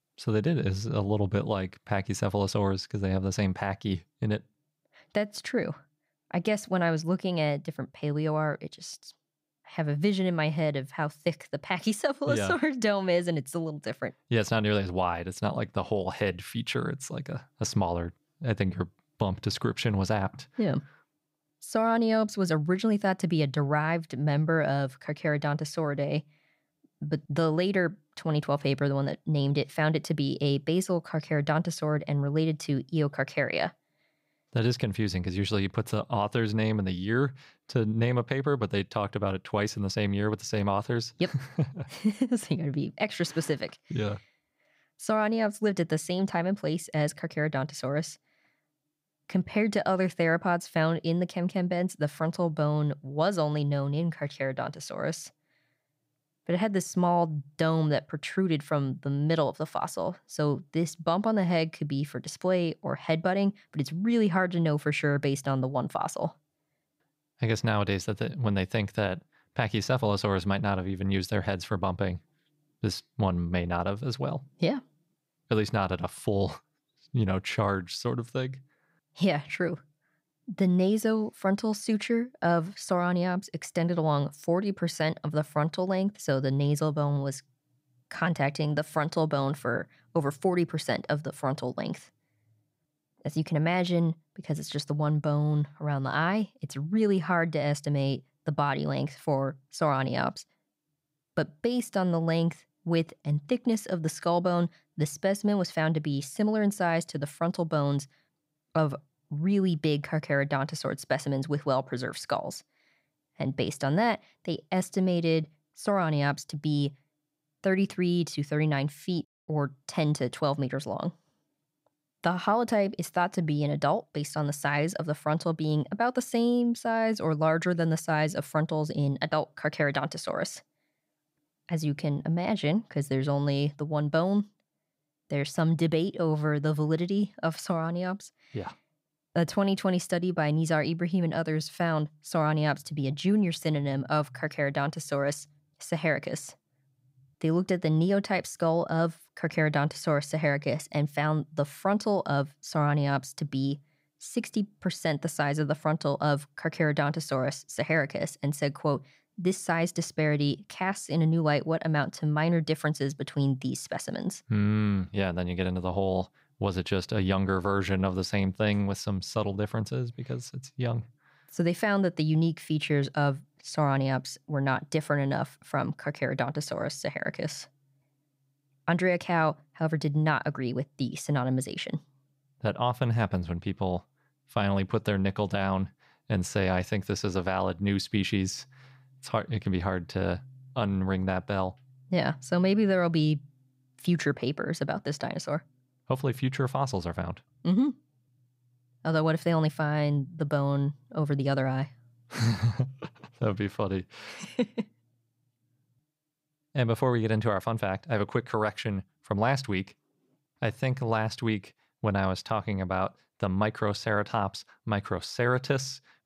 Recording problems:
none

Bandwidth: 15.5 kHz